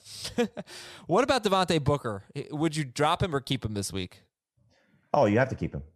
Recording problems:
none

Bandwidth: 14.5 kHz